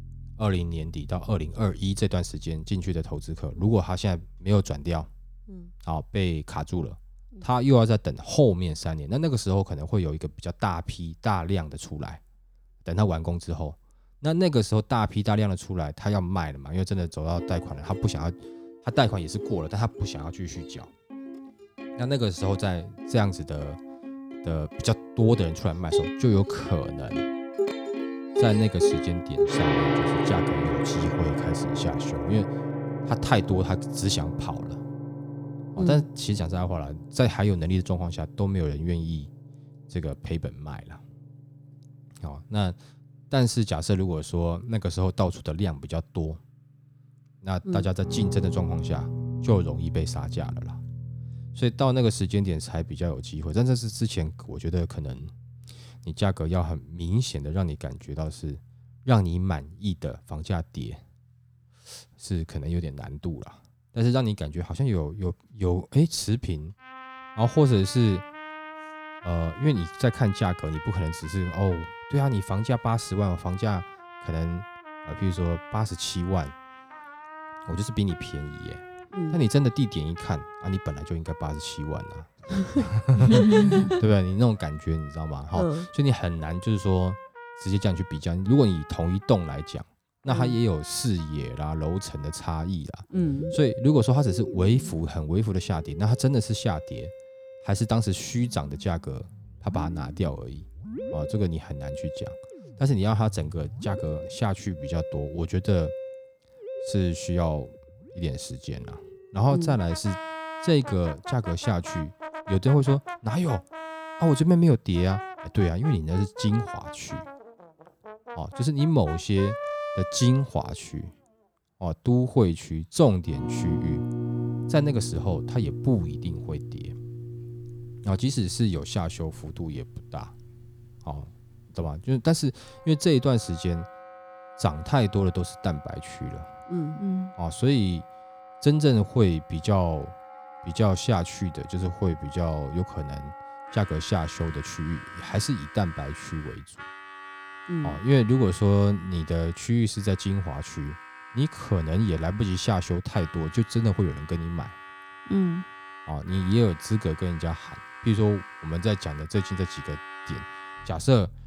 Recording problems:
background music; loud; throughout; 10 dB below the speech

